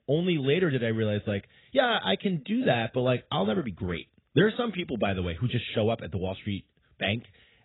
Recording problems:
garbled, watery; badly; nothing above 4 kHz

